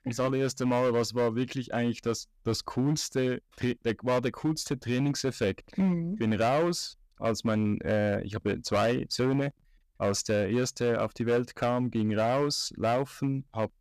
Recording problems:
distortion; slight; 8% of the sound clipped

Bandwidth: 14.5 kHz